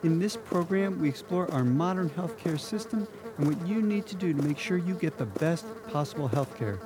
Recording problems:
electrical hum; loud; throughout; 60 Hz, 9 dB below the speech

